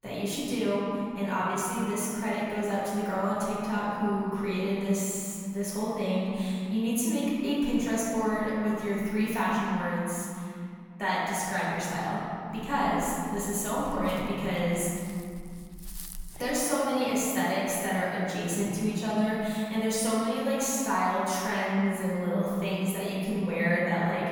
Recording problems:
room echo; strong; dies away in 2.7 s
off-mic speech; far
dog barking; faint; from 13 to 17 s; peak 10 dB below the speech

